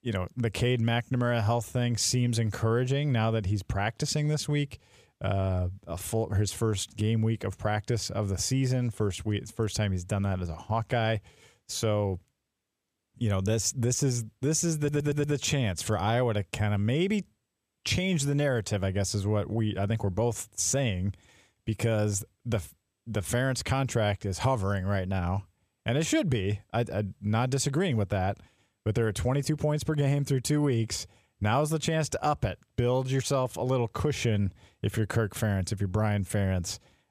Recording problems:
audio stuttering; at 15 s

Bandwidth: 14.5 kHz